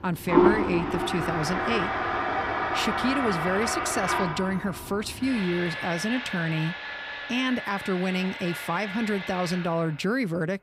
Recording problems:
household noises; loud; throughout; as loud as the speech

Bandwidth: 15.5 kHz